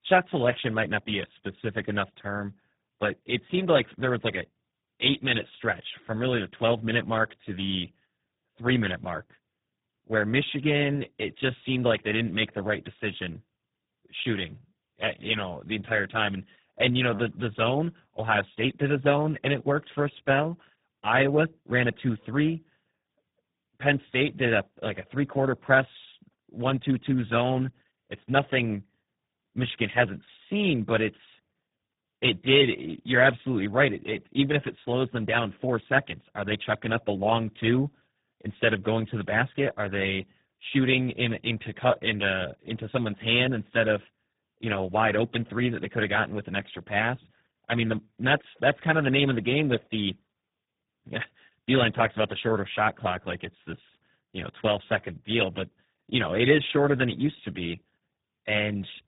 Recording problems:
garbled, watery; badly
high frequencies cut off; severe; nothing above 3.5 kHz

